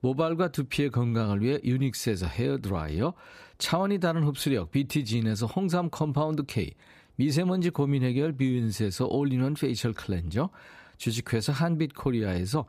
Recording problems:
none

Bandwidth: 14.5 kHz